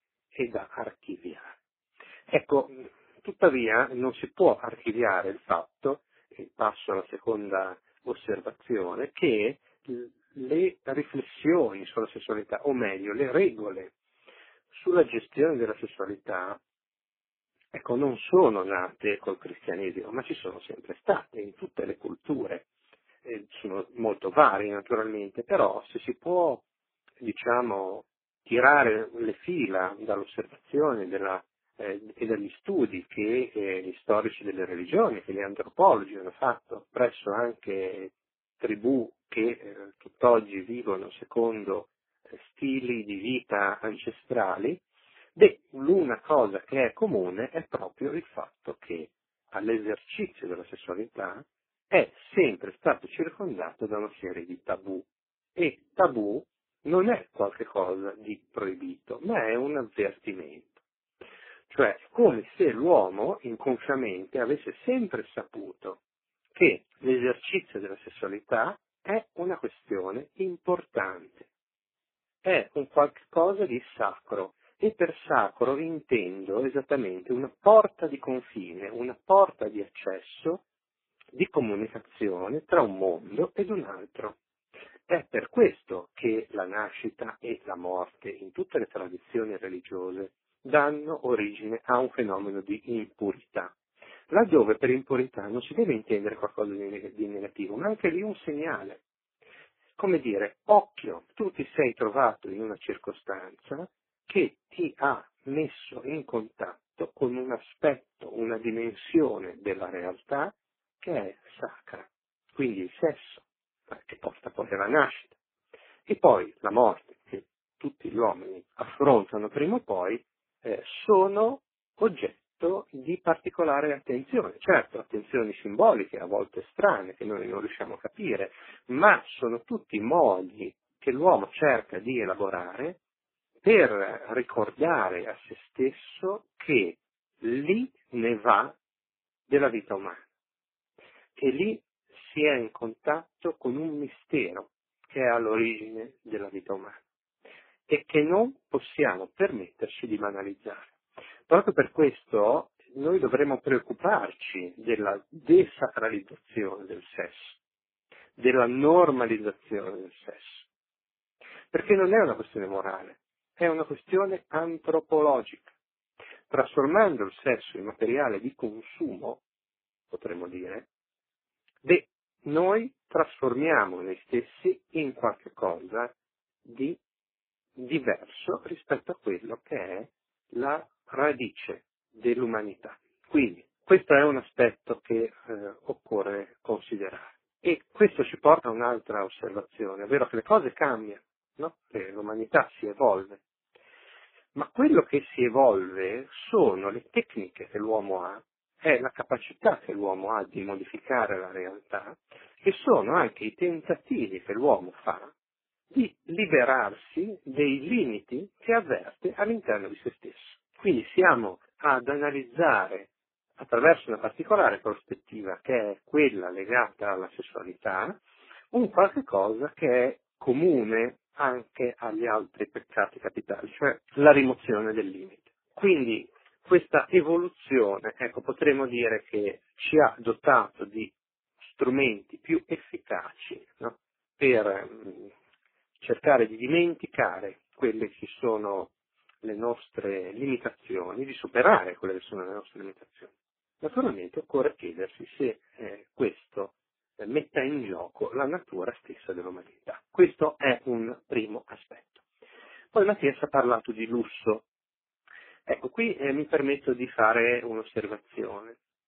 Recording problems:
phone-call audio; poor line
garbled, watery; badly

